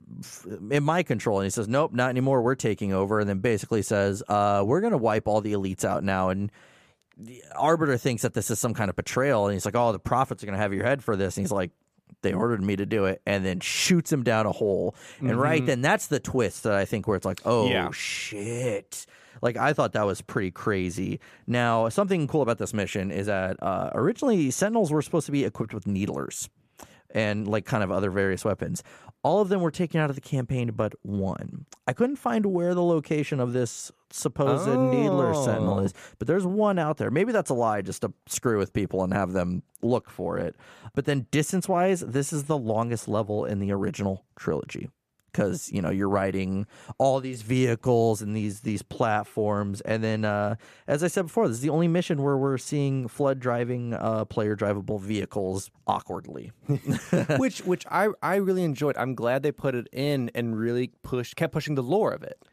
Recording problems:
none

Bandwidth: 14.5 kHz